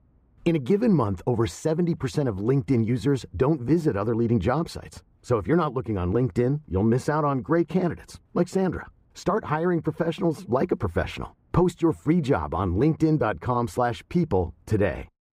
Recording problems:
muffled; very; fading above 2.5 kHz

